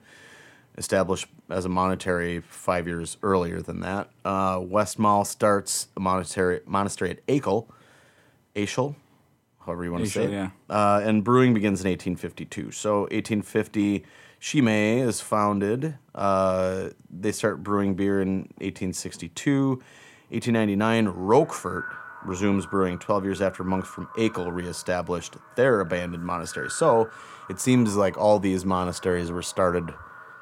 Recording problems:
echo of what is said; noticeable; from 21 s on; 260 ms later, 15 dB below the speech

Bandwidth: 16.5 kHz